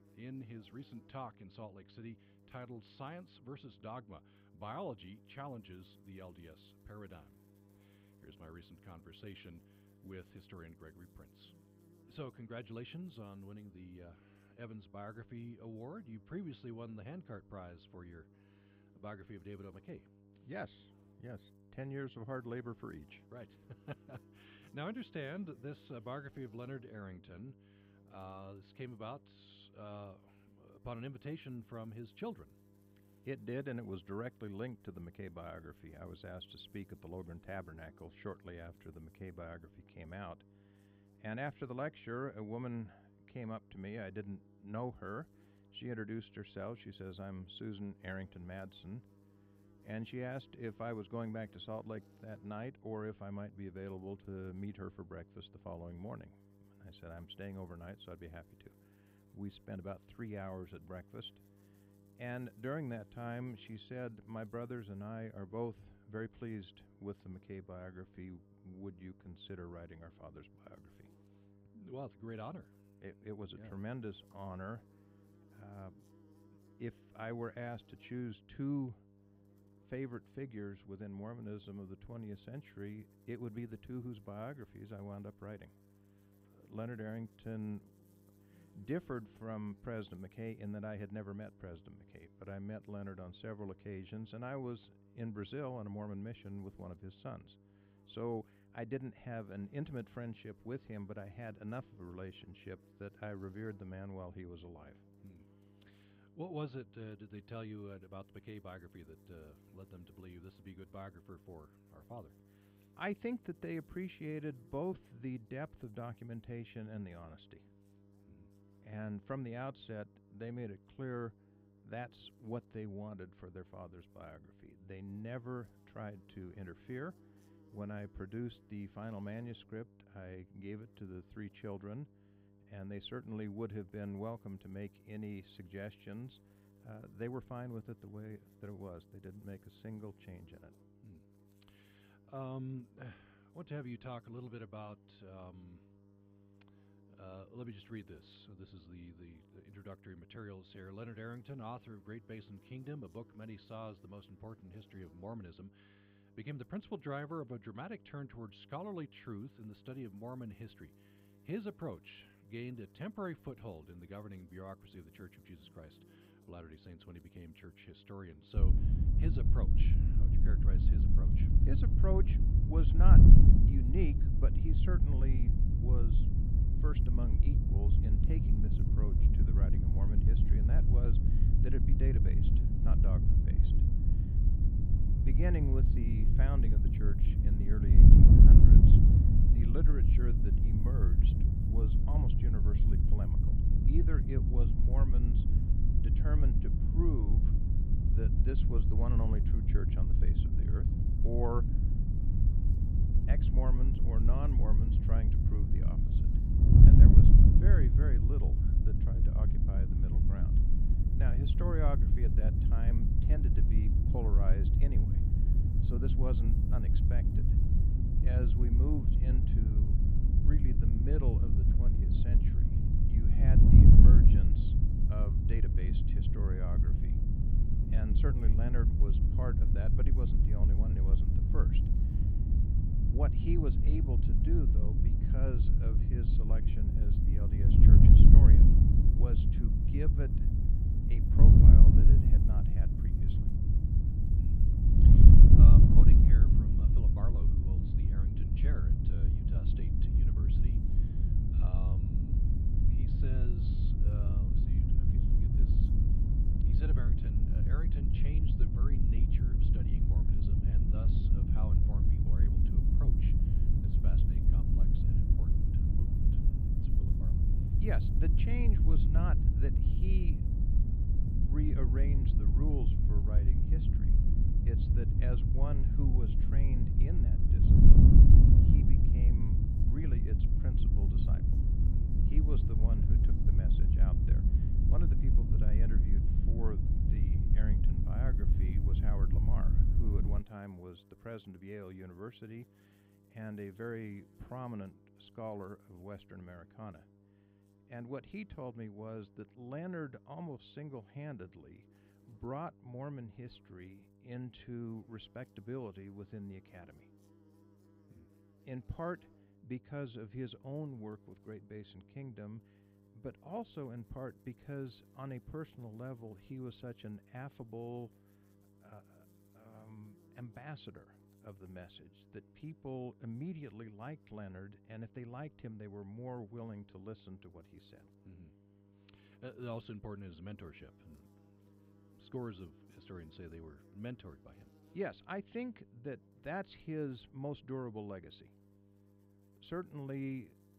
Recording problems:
muffled; very; fading above 3 kHz
wind noise on the microphone; heavy; from 2:49 to 4:50; 4 dB above the speech
electrical hum; faint; throughout; 50 Hz, 20 dB below the speech

